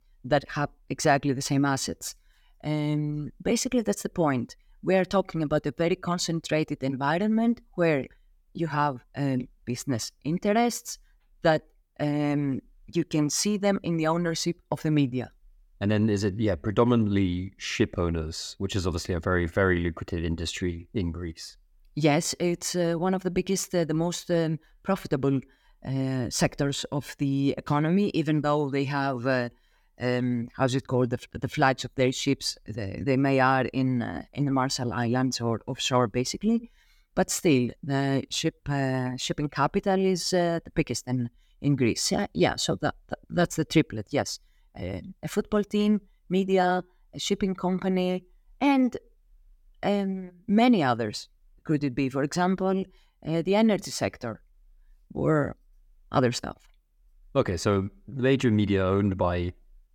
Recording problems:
none

